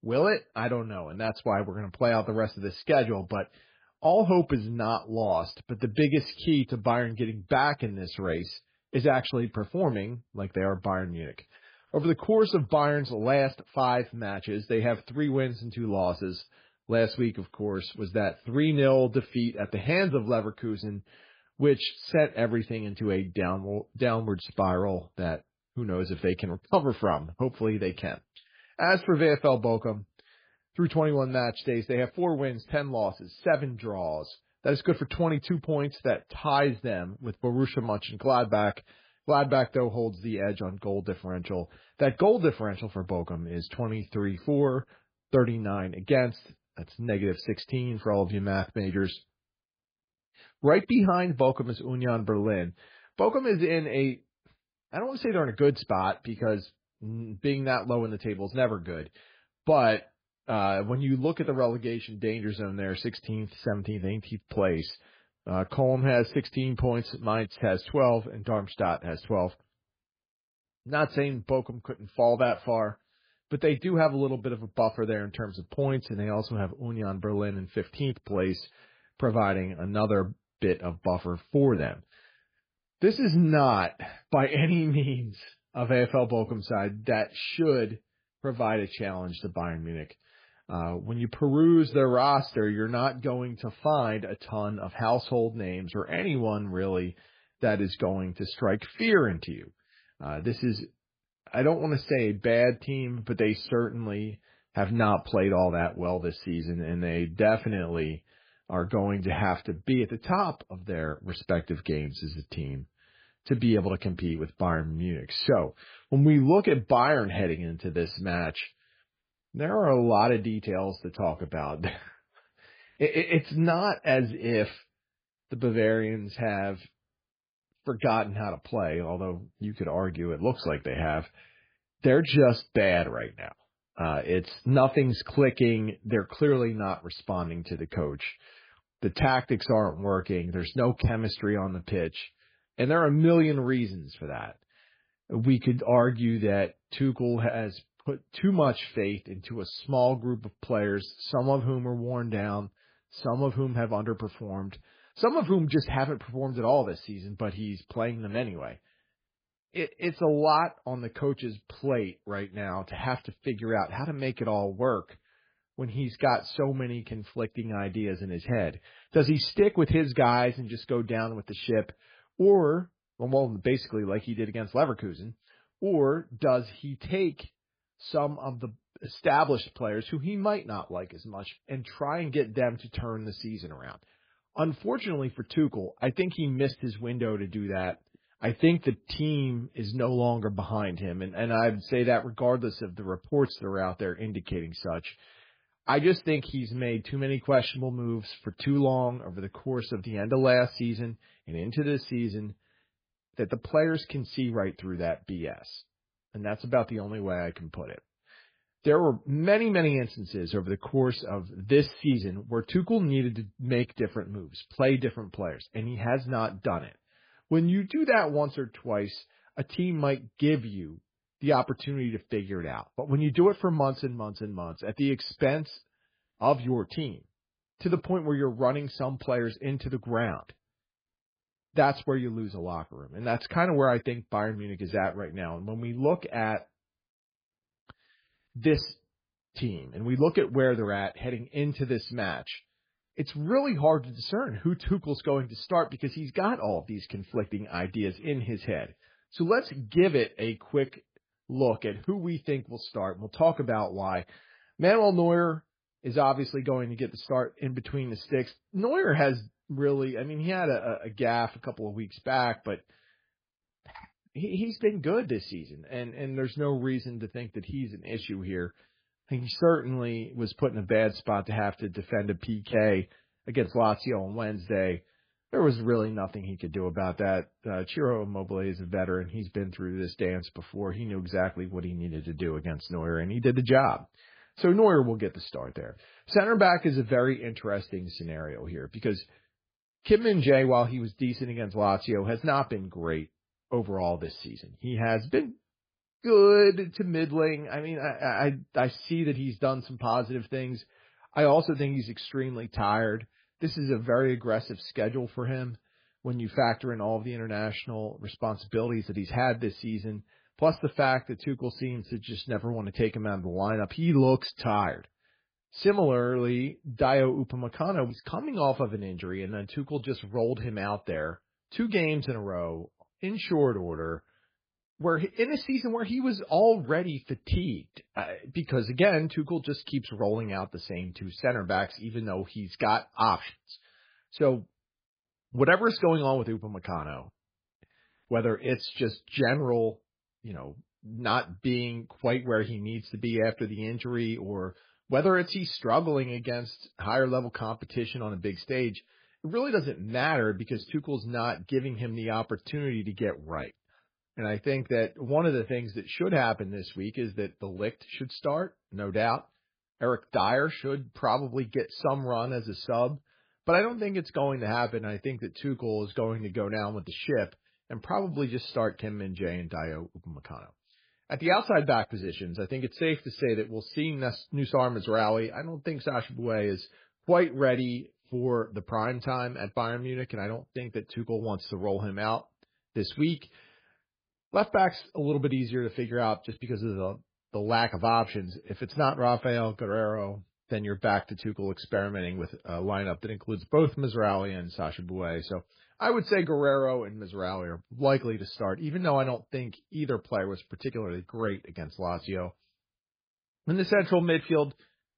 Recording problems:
garbled, watery; badly

